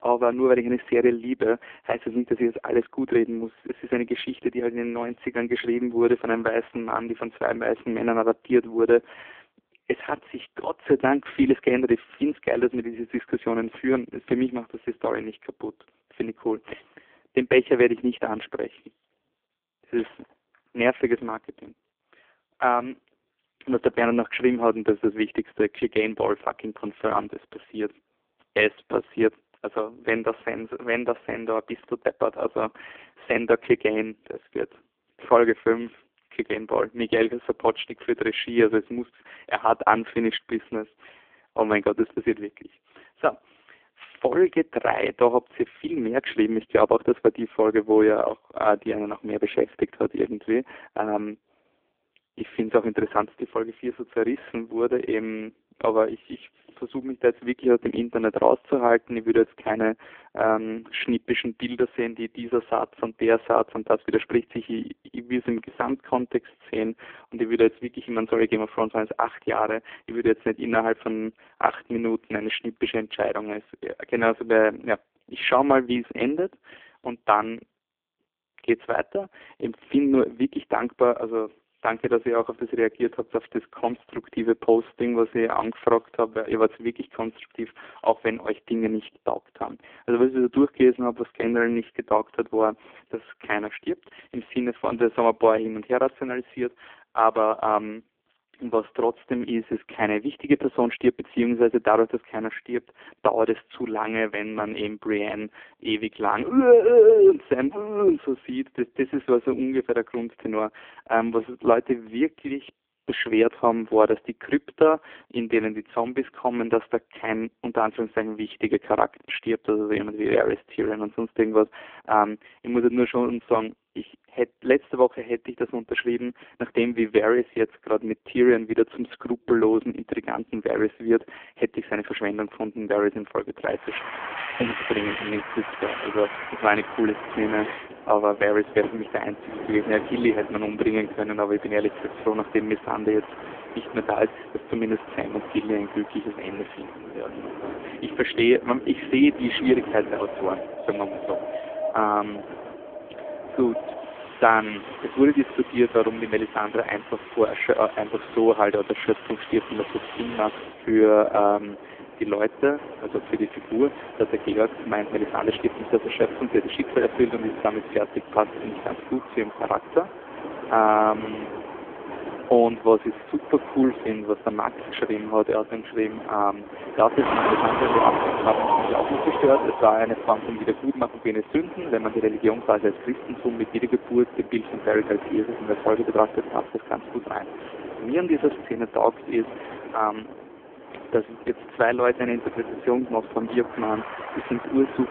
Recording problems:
phone-call audio; poor line
wind in the background; loud; from 2:14 on; 9 dB below the speech
choppy; occasionally; at 1:59; 4% of the speech affected

